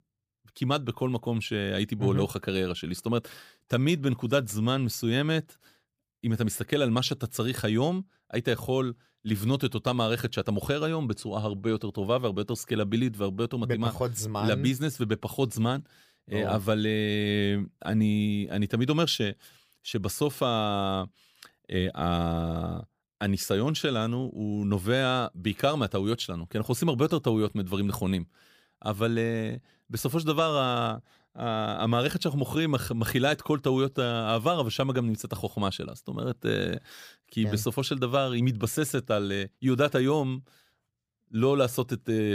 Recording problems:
abrupt cut into speech; at the end

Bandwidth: 15 kHz